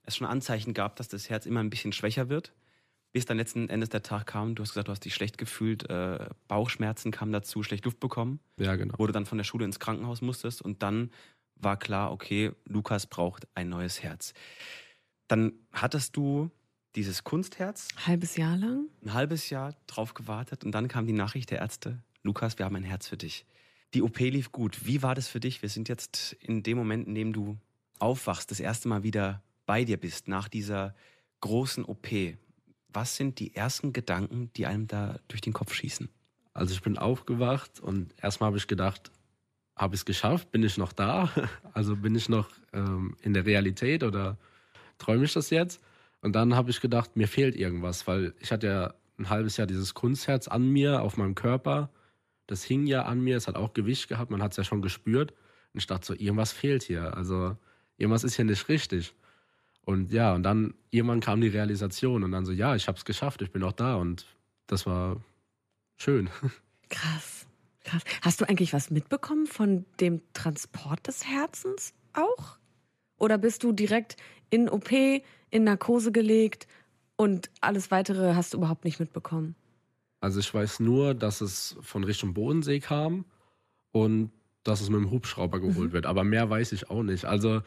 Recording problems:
none

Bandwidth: 14.5 kHz